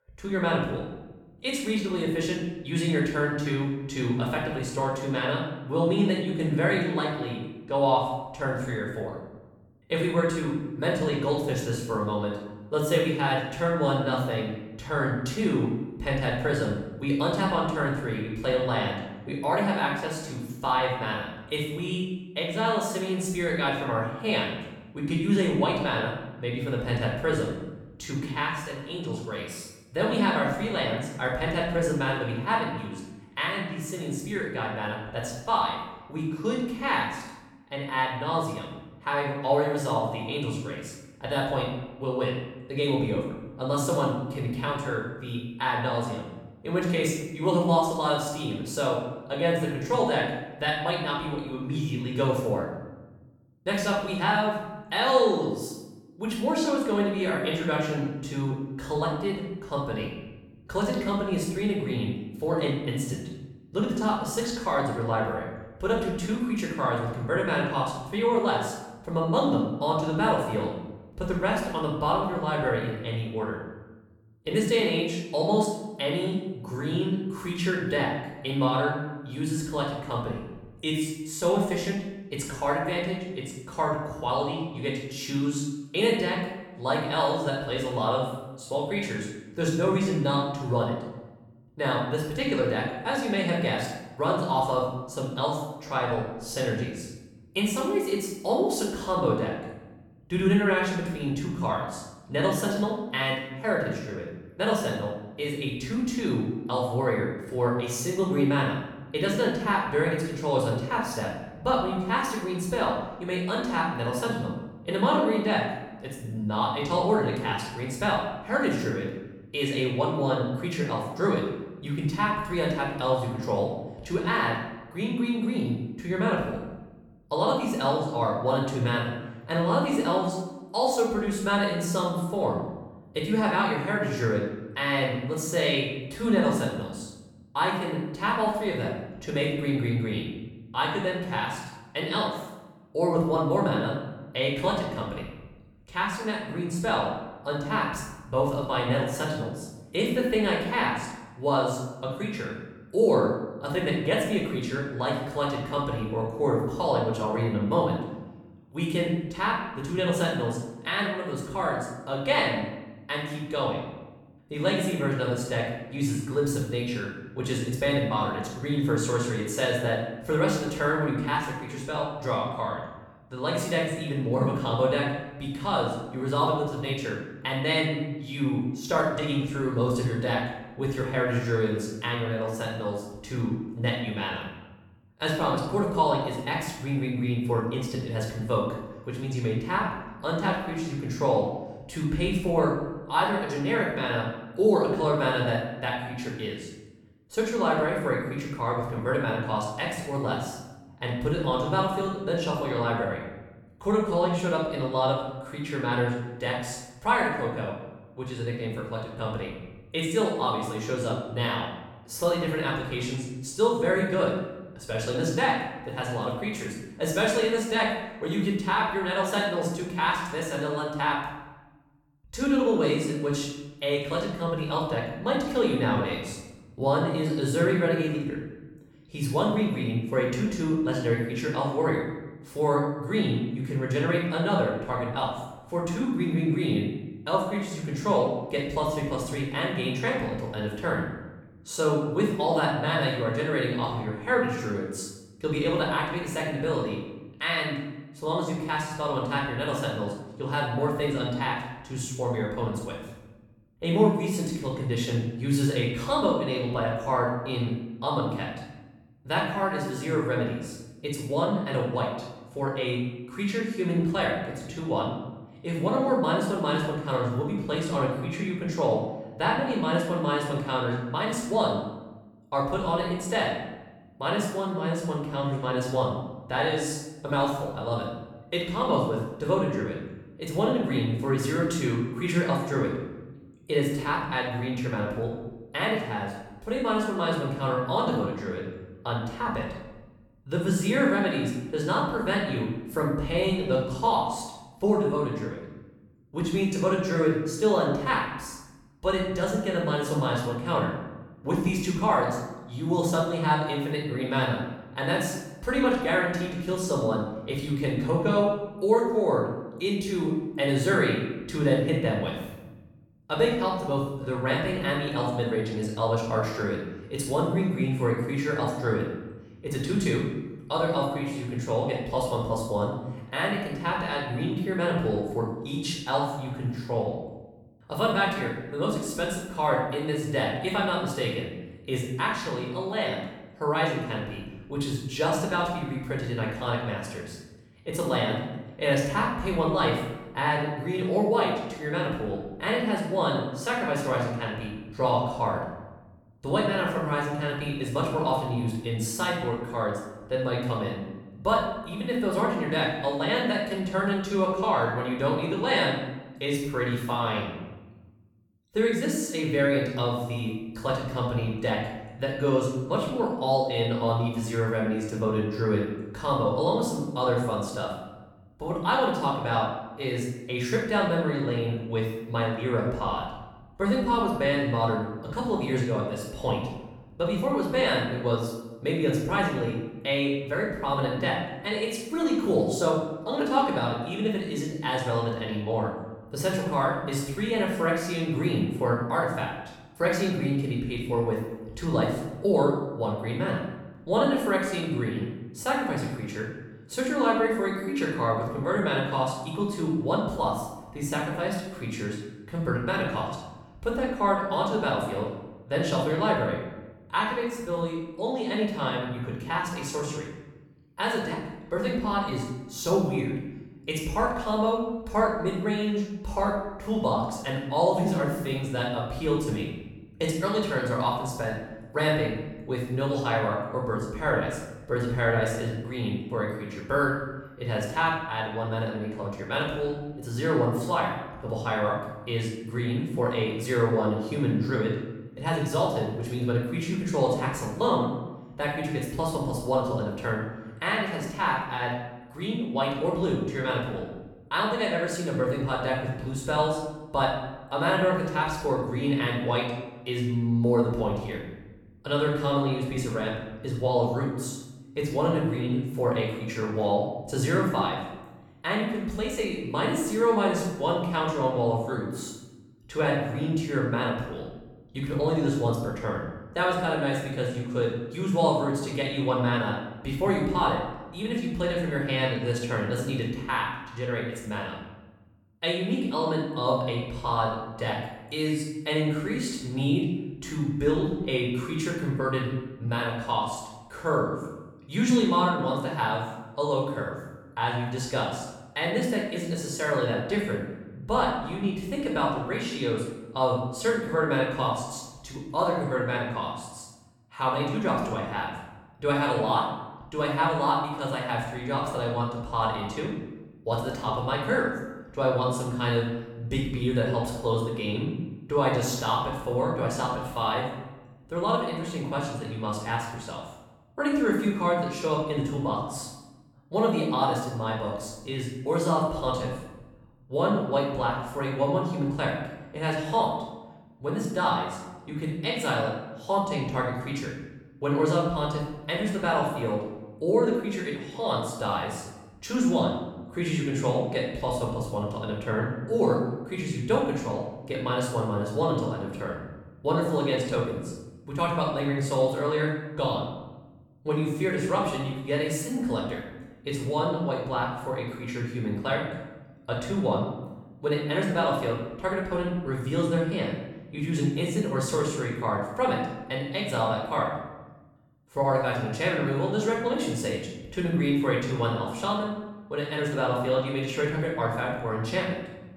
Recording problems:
off-mic speech; far
room echo; noticeable; dies away in 0.9 s

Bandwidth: 17.5 kHz